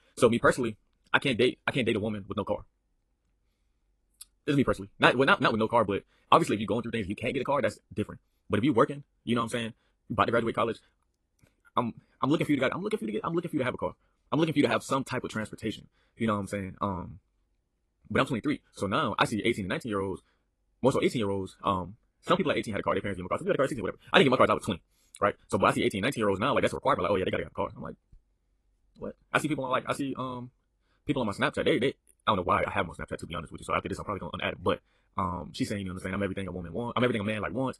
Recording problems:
wrong speed, natural pitch; too fast; 1.8 times normal speed
garbled, watery; slightly; nothing above 11.5 kHz

